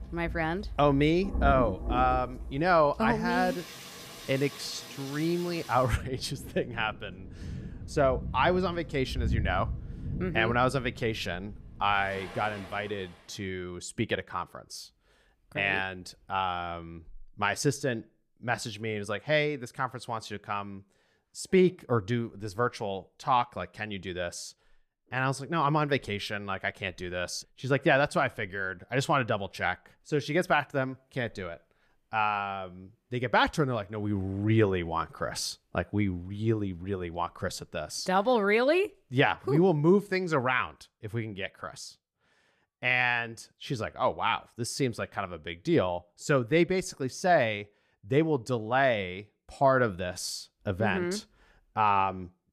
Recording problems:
rain or running water; loud; until 13 s; 10 dB below the speech

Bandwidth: 15 kHz